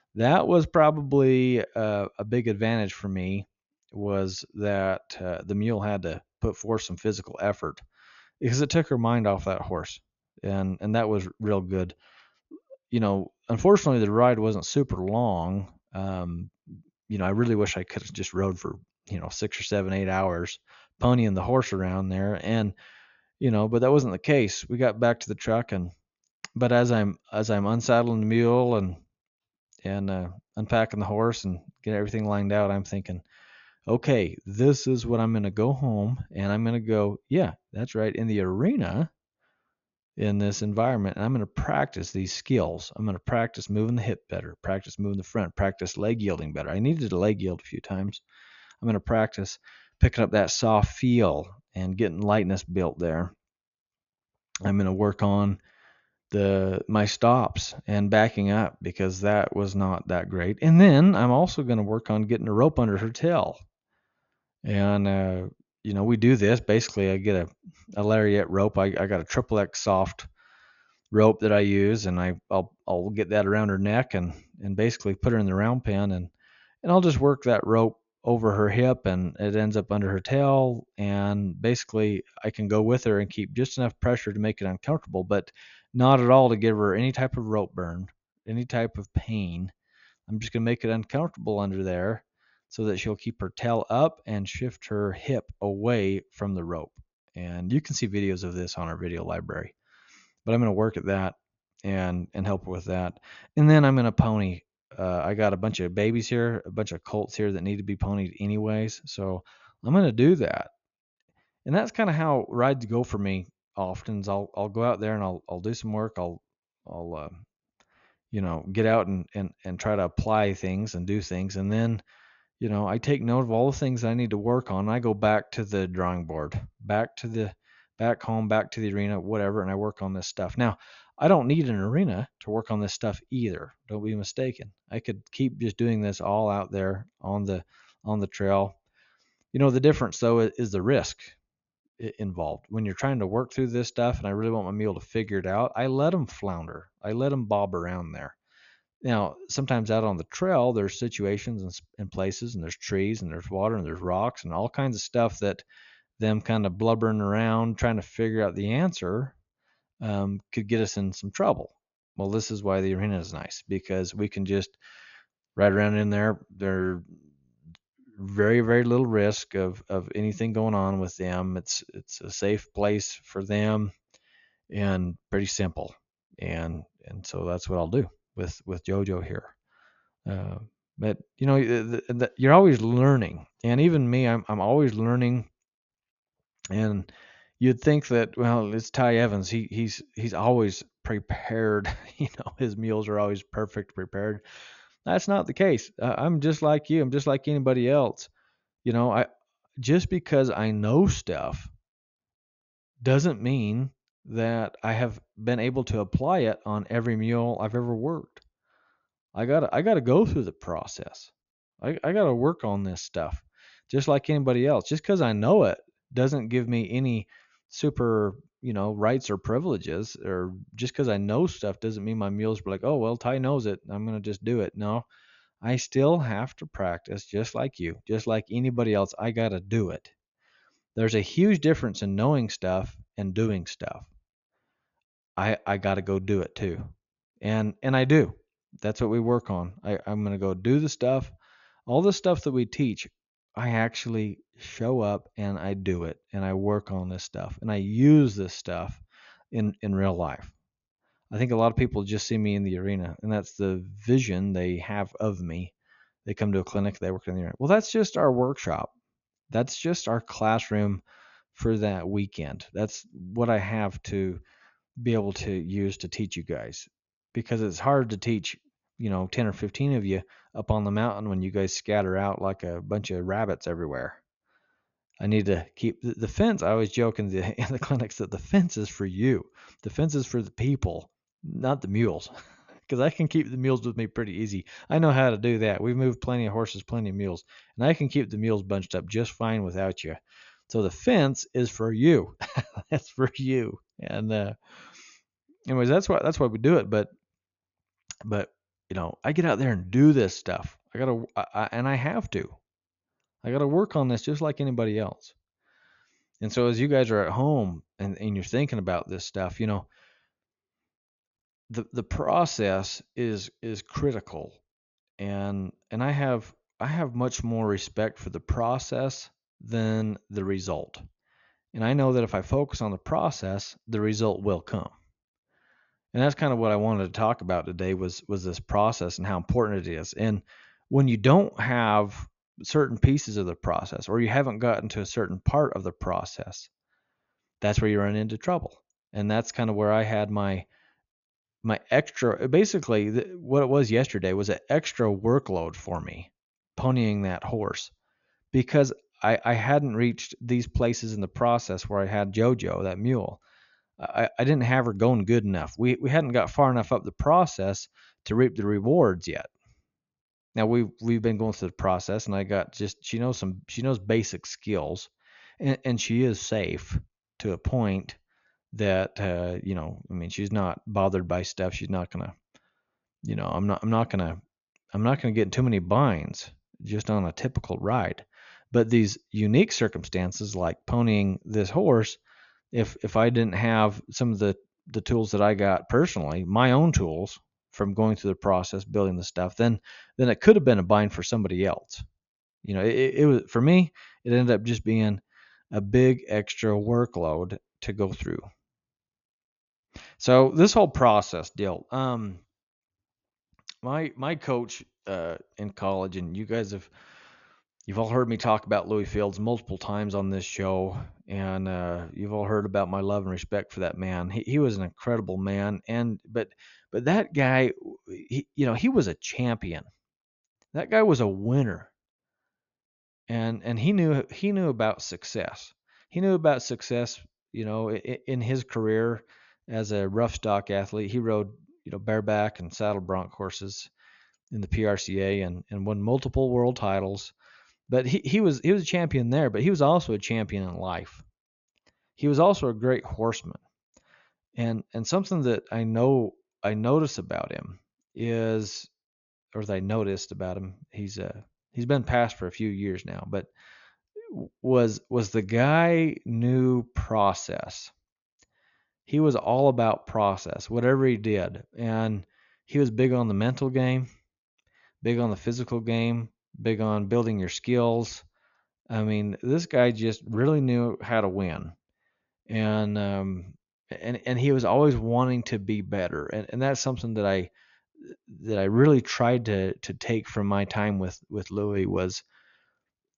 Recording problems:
high frequencies cut off; noticeable; nothing above 7 kHz

